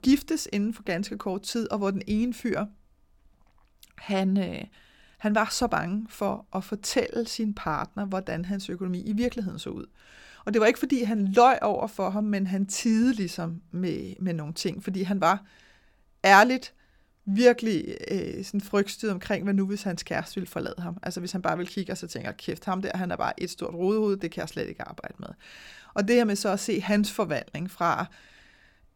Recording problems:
none

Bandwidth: 18 kHz